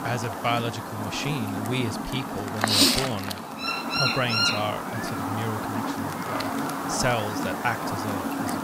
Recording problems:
animal sounds; very loud; throughout; 4 dB above the speech

